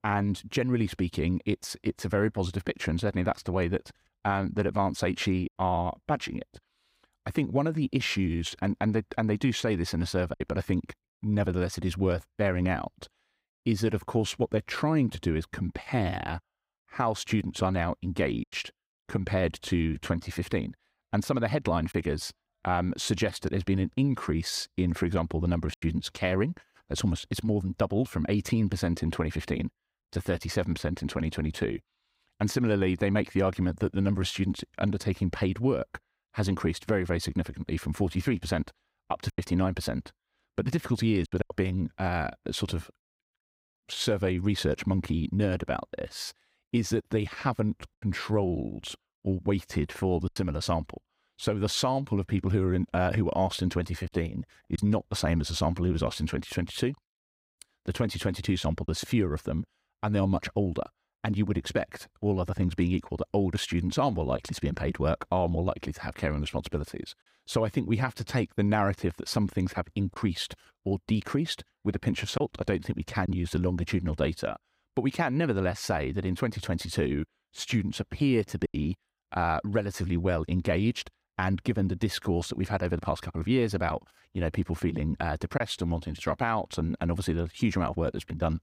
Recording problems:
choppy; occasionally; 1% of the speech affected

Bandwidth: 15.5 kHz